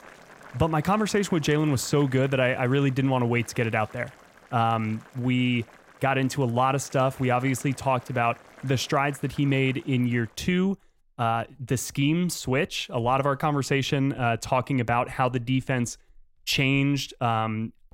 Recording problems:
household noises; faint; throughout; 25 dB below the speech

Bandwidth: 16 kHz